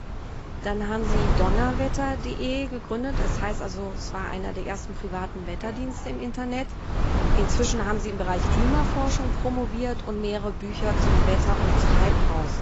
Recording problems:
garbled, watery; badly; nothing above 7.5 kHz
wind noise on the microphone; heavy; 2 dB below the speech
animal sounds; very faint; until 7.5 s; 20 dB below the speech

